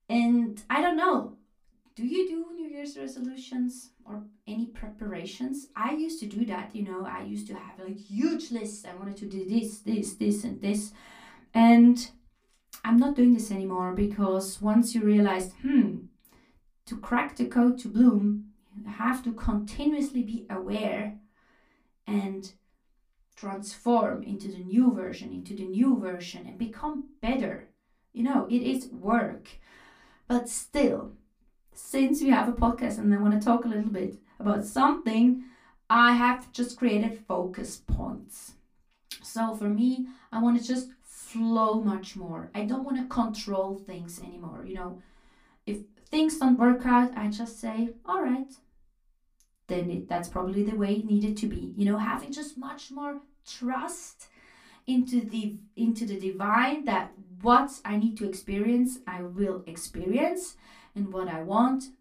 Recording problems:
off-mic speech; far
room echo; very slight; dies away in 0.2 s

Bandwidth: 15 kHz